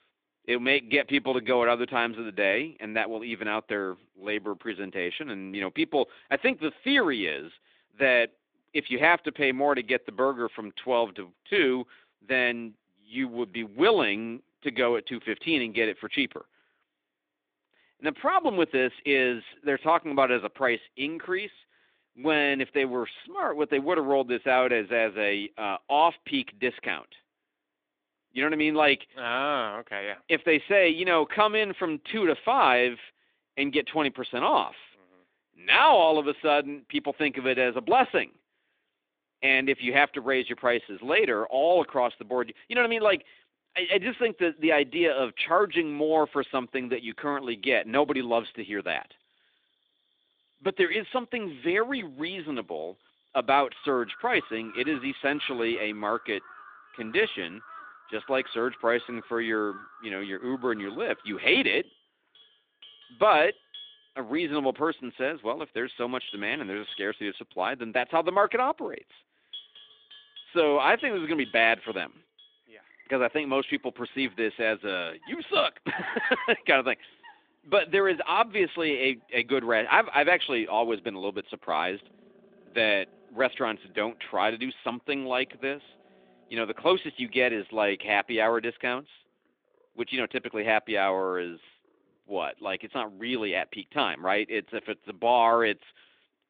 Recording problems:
phone-call audio; nothing above 3.5 kHz
animal sounds; faint; from 44 s on; 25 dB below the speech

